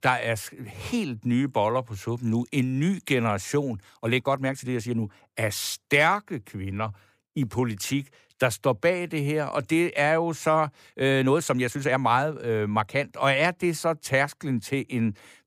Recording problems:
uneven, jittery; strongly; from 4 to 13 s

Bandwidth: 15 kHz